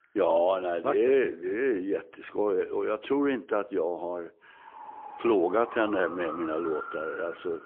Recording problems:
phone-call audio; poor line; nothing above 3.5 kHz
traffic noise; noticeable; from 4.5 s on; 10 dB below the speech

